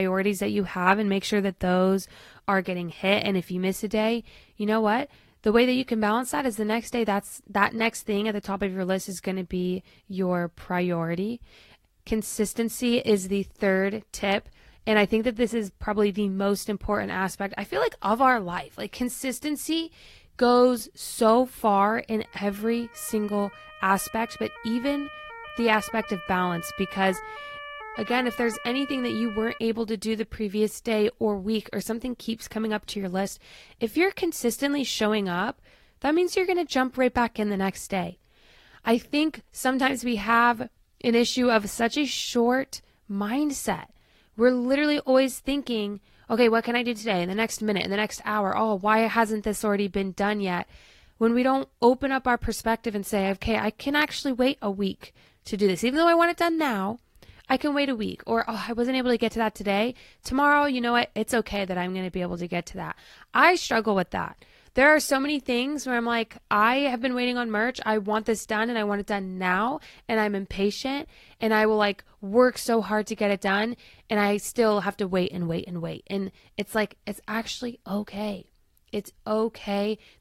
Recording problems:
garbled, watery; slightly; nothing above 16 kHz
abrupt cut into speech; at the start
siren; faint; from 22 to 30 s; peak 10 dB below the speech

